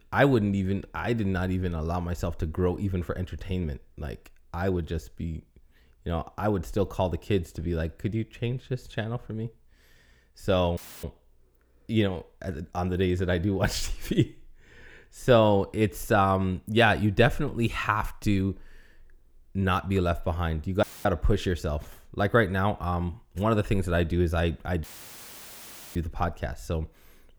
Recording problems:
audio cutting out; filled with static; at 11 s, at 21 s and at 25 s for 1 s

